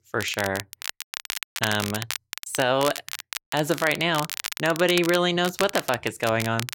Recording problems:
crackle, like an old record; loud; 8 dB below the speech

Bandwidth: 16.5 kHz